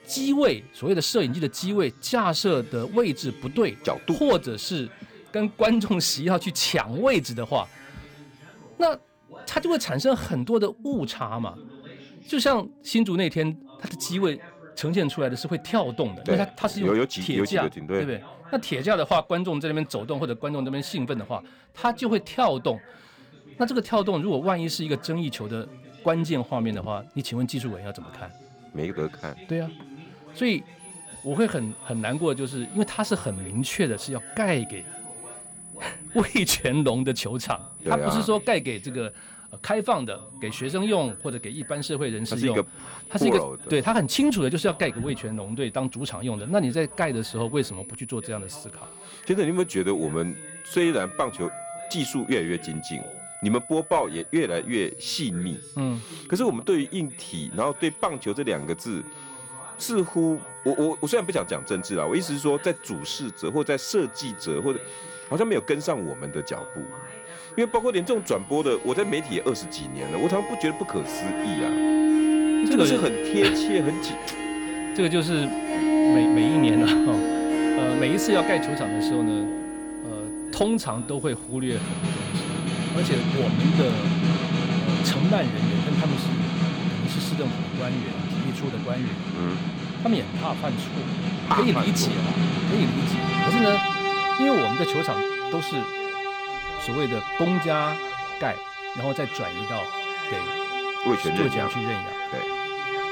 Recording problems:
background music; very loud; throughout; as loud as the speech
high-pitched whine; noticeable; from 31 s to 1:23; 10 kHz, 15 dB below the speech
voice in the background; faint; throughout; 20 dB below the speech

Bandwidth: 18 kHz